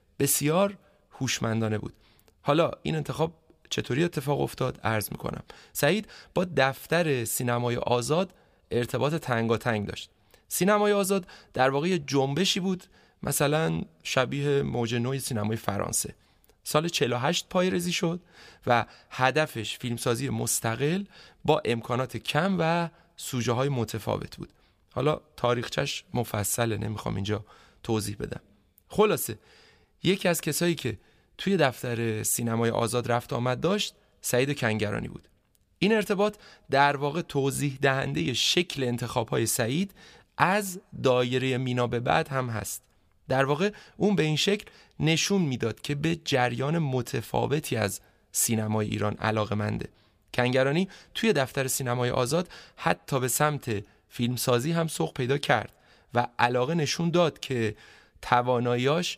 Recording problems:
none

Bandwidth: 15 kHz